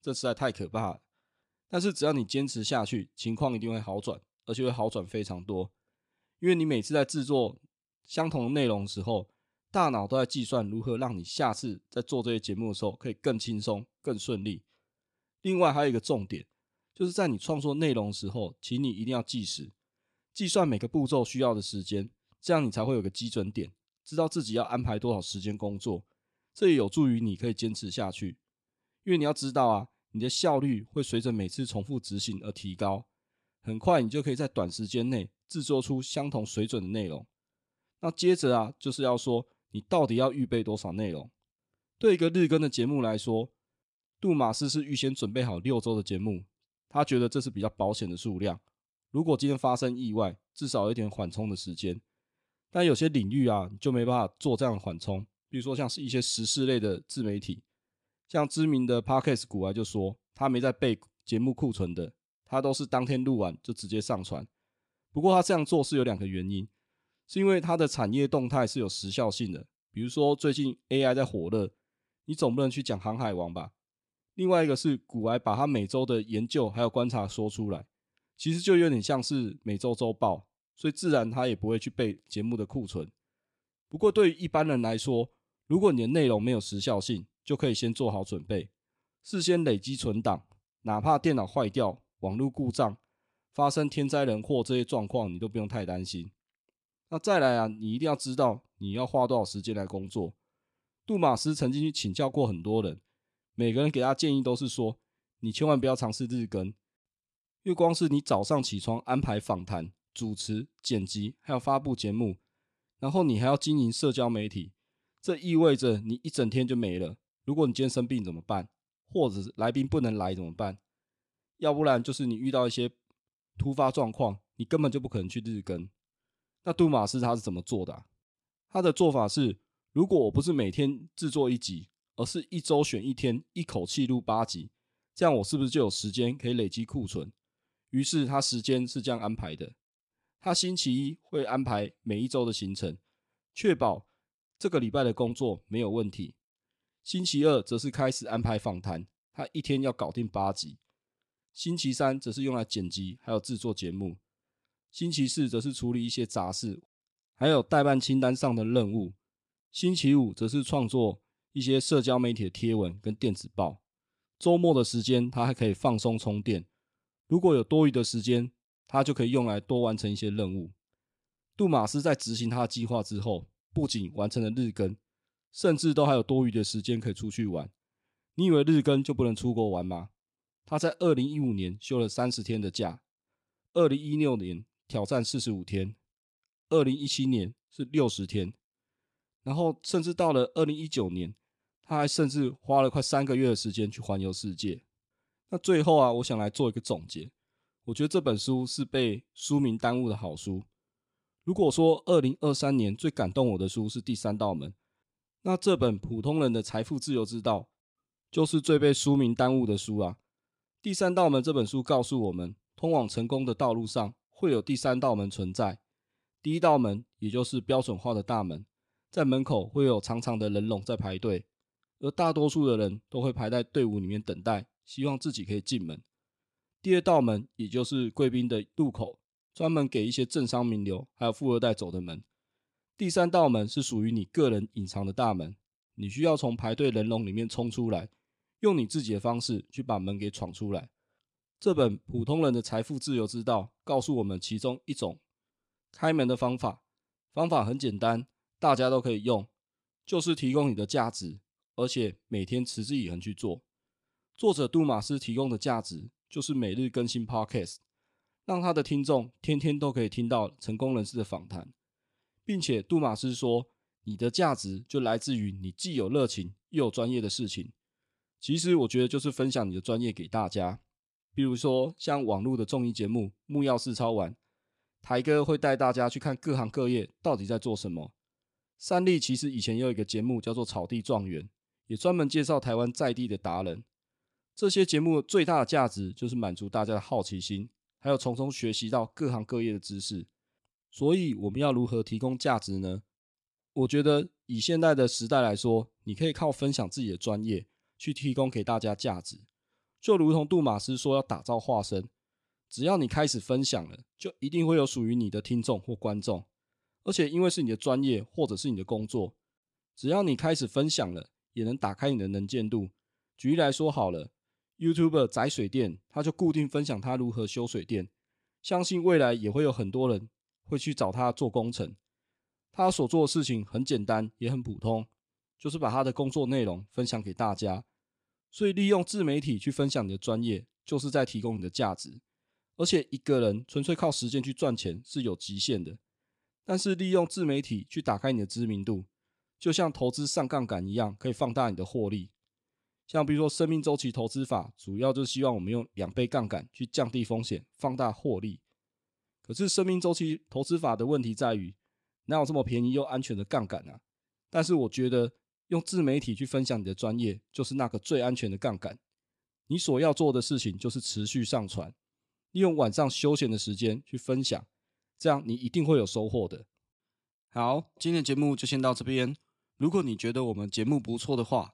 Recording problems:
none

